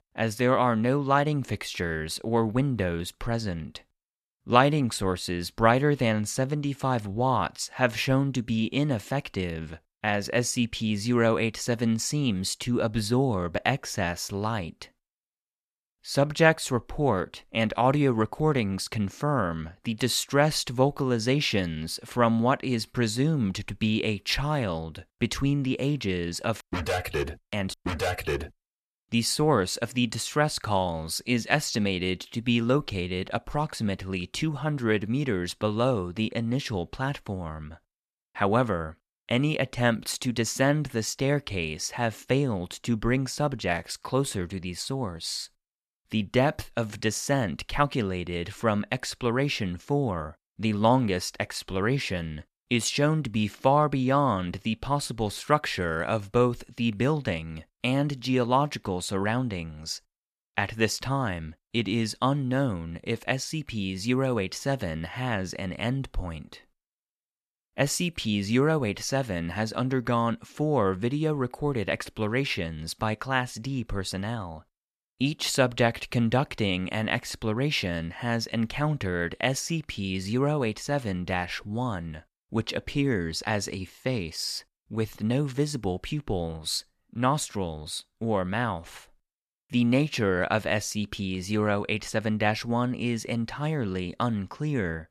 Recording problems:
none

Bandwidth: 14 kHz